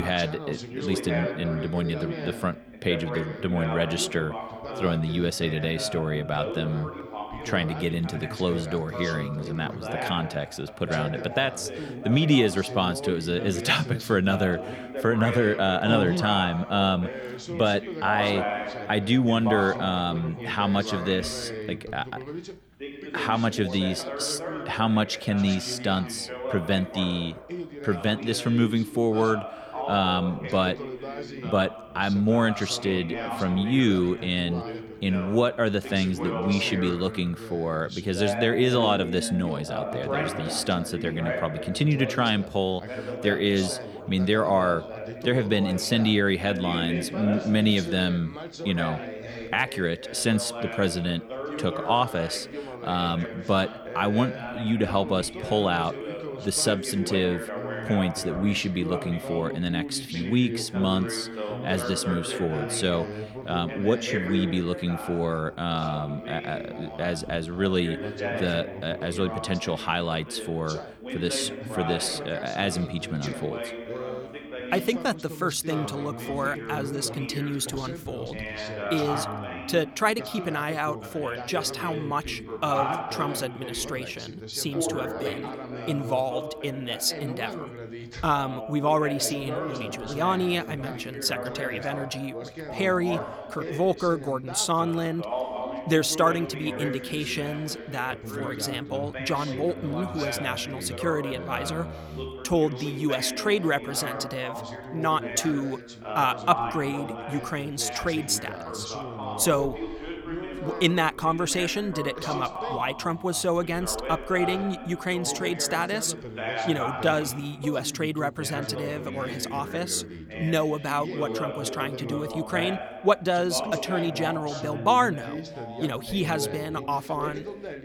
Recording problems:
background chatter; loud; throughout; 2 voices, 8 dB below the speech
abrupt cut into speech; at the start

